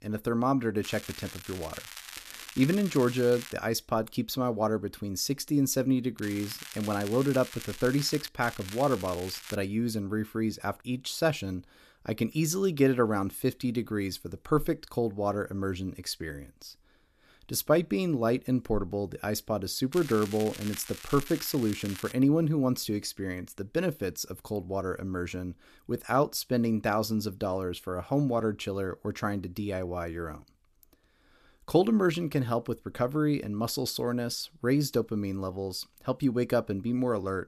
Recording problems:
crackling; noticeable; 4 times, first at 1 s; 15 dB below the speech

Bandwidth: 14.5 kHz